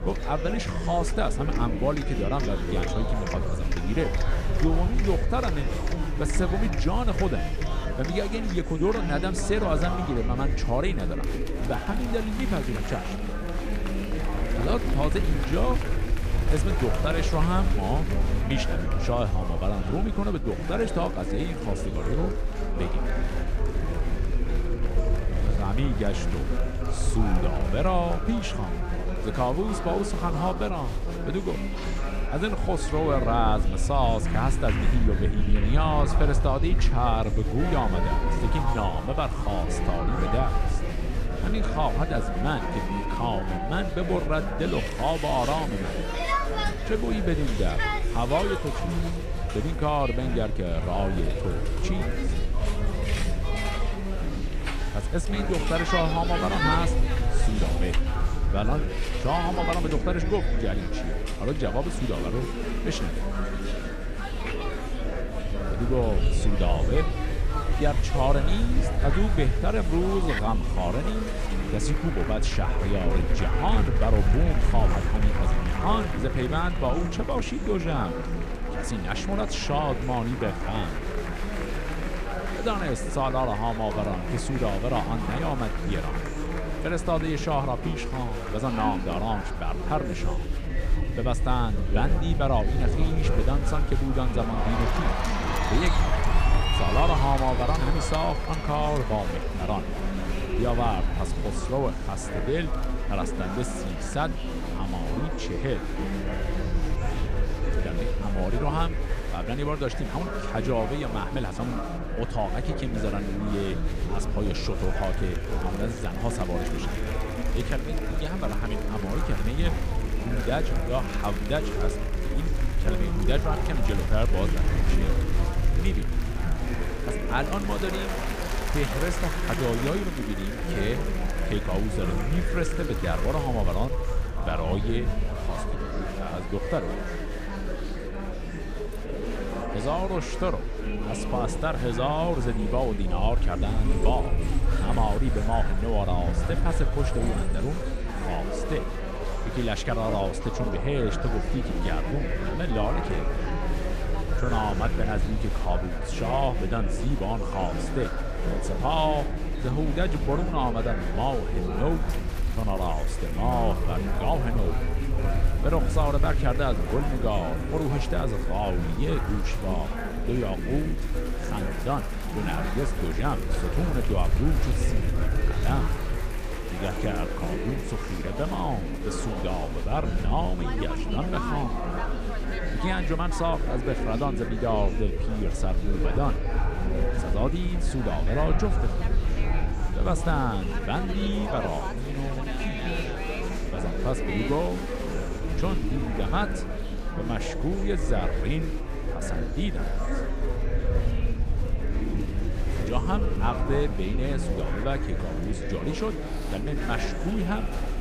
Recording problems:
murmuring crowd; loud; throughout; 3 dB below the speech
low rumble; faint; throughout; 20 dB below the speech

